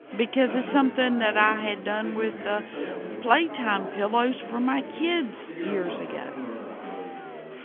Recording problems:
phone-call audio; nothing above 3.5 kHz
chatter from many people; noticeable; throughout; 10 dB below the speech

